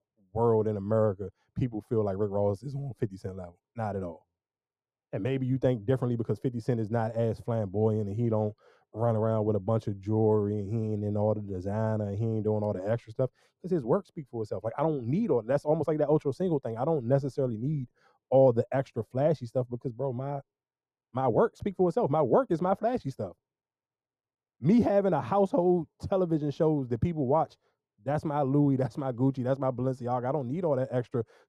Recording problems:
muffled; very; fading above 1.5 kHz

